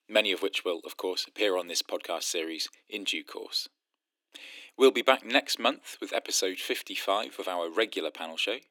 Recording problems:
thin; very; fading below 300 Hz

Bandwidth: 17.5 kHz